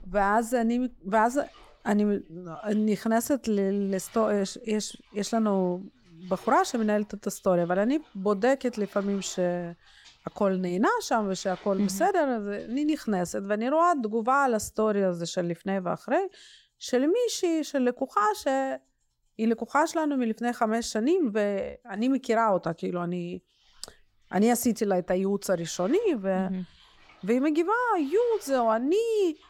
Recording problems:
household noises; faint; throughout; 30 dB below the speech

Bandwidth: 17.5 kHz